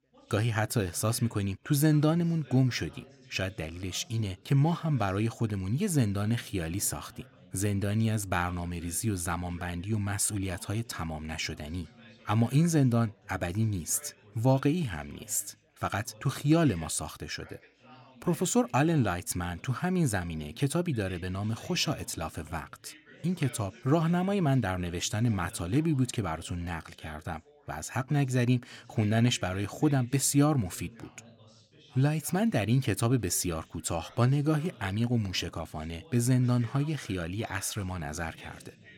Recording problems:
background chatter; faint; throughout; 3 voices, 25 dB below the speech

